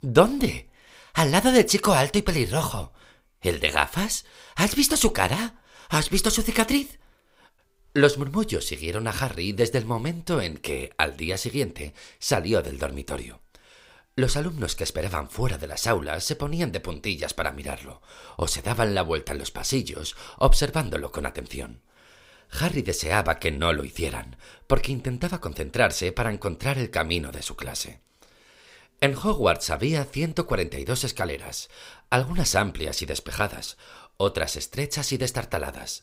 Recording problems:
none

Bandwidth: 15.5 kHz